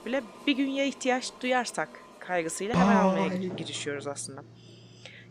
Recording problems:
household noises; very loud; throughout; 3 dB above the speech

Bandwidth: 15 kHz